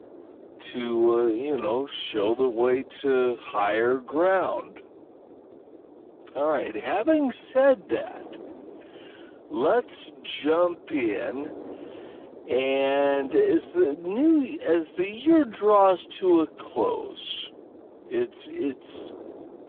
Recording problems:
phone-call audio; poor line; nothing above 3.5 kHz
wrong speed, natural pitch; too slow; 0.5 times normal speed
wind noise on the microphone; occasional gusts; 20 dB below the speech

